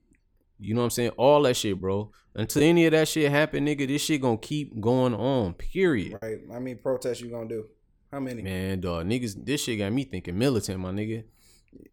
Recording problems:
choppy; occasionally; at 6 s; 2% of the speech affected

